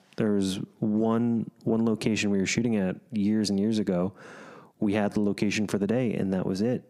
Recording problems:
squashed, flat; heavily

